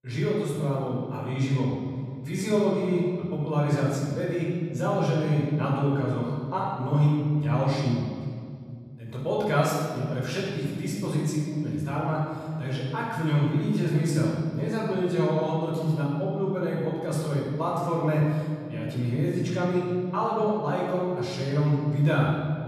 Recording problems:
room echo; strong; dies away in 2.3 s
off-mic speech; far

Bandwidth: 14.5 kHz